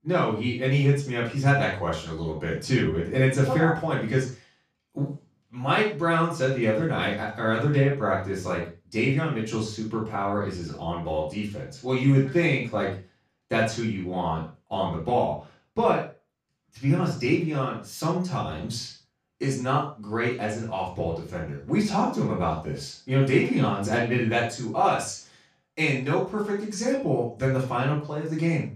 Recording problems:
off-mic speech; far
room echo; noticeable; dies away in 0.3 s

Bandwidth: 15 kHz